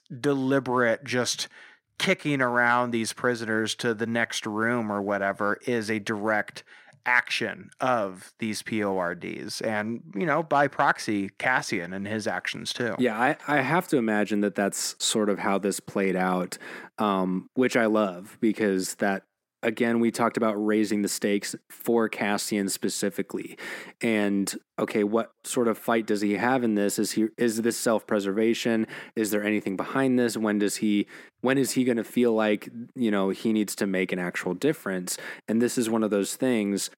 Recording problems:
thin; very slightly; fading below 300 Hz

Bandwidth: 16.5 kHz